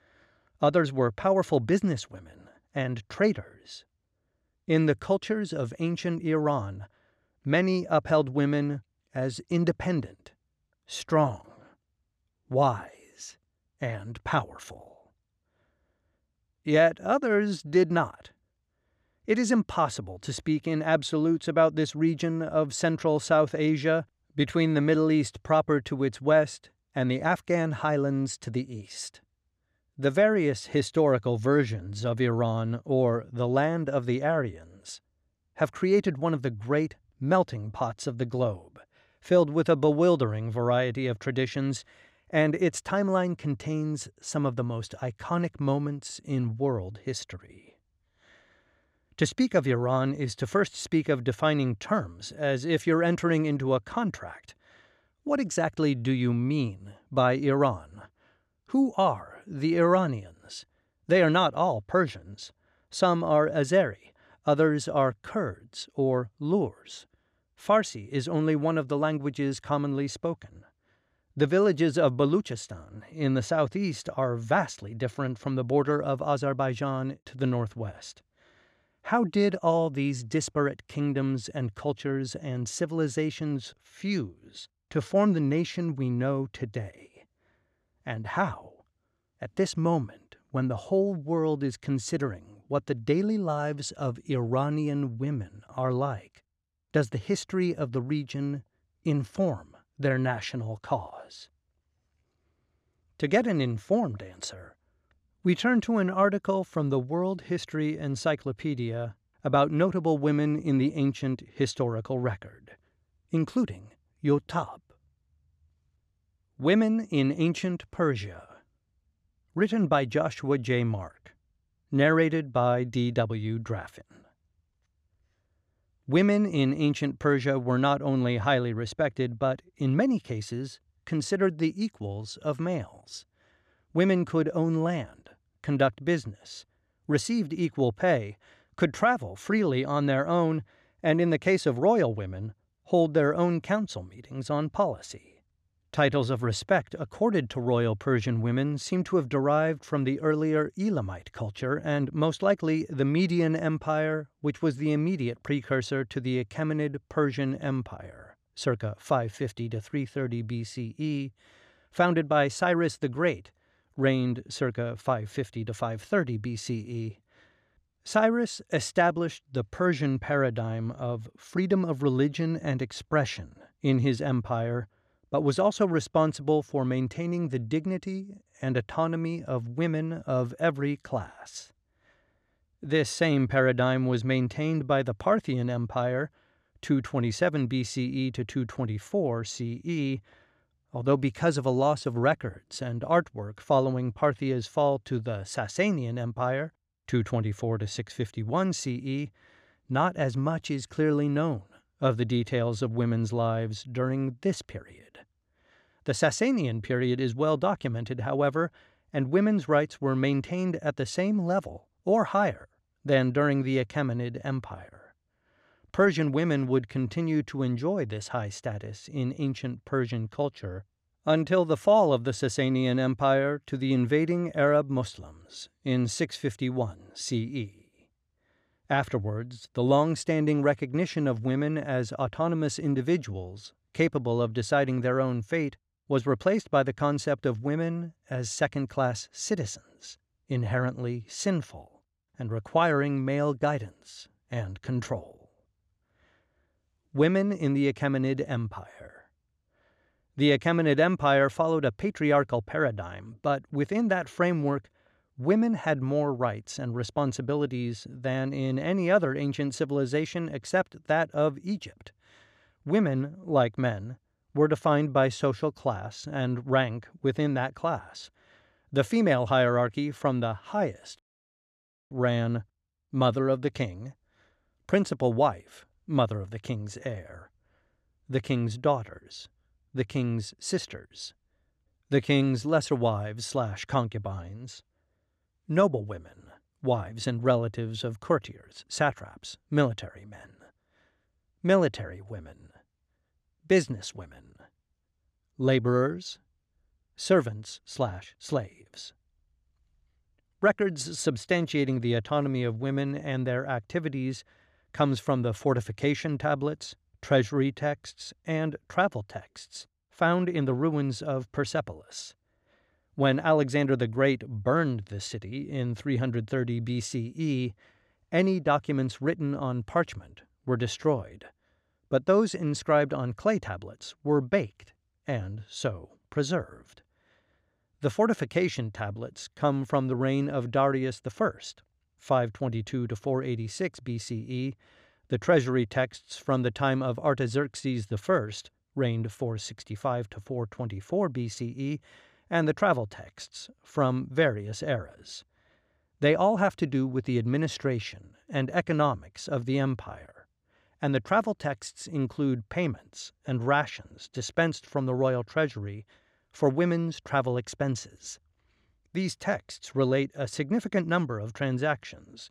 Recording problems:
audio cutting out; at 4:31 for 1 s

